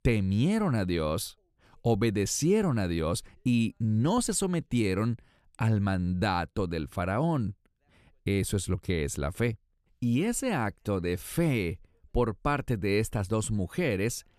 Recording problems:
none

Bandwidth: 14 kHz